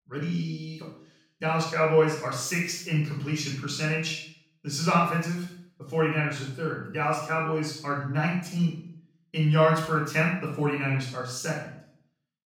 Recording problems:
off-mic speech; far
room echo; noticeable; dies away in 0.5 s

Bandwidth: 17 kHz